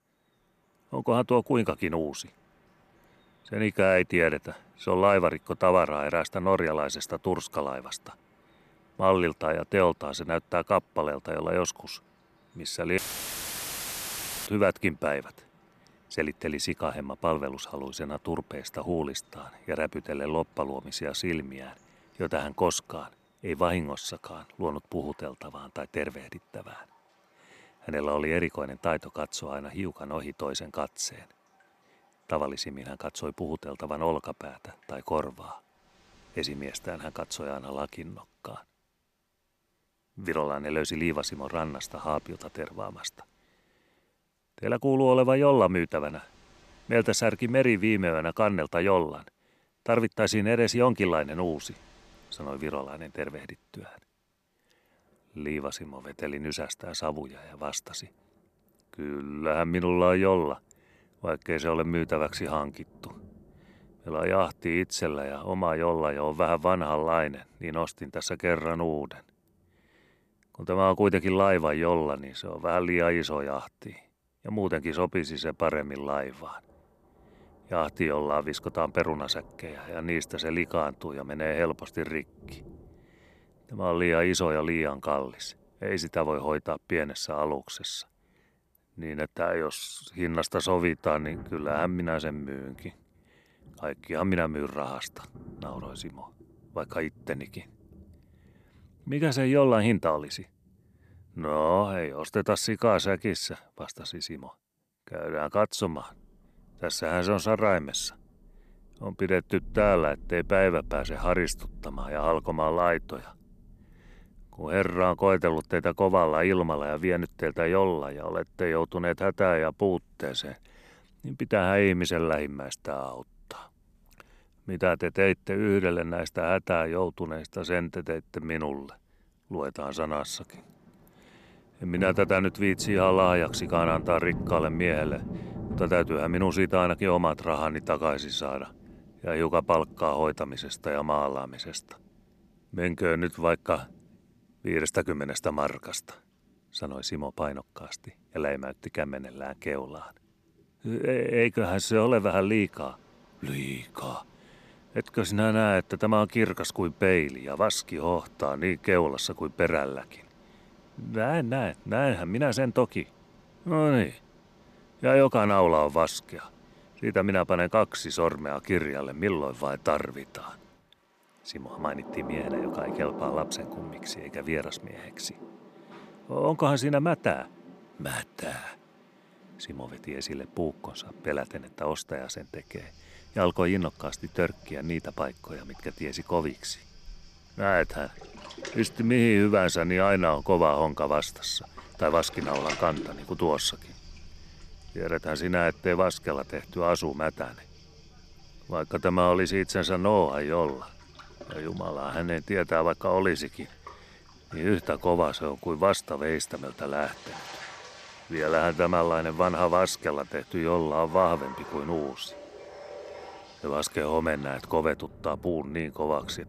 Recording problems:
rain or running water; noticeable; throughout; 20 dB below the speech
audio cutting out; filled with static; at 13 s for 1.5 s

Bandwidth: 14 kHz